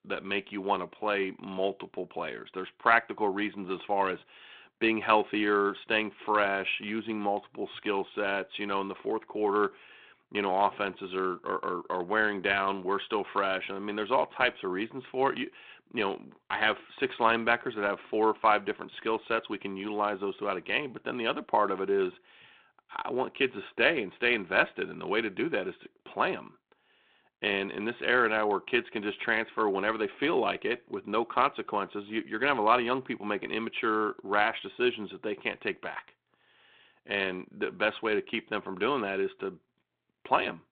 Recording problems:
phone-call audio

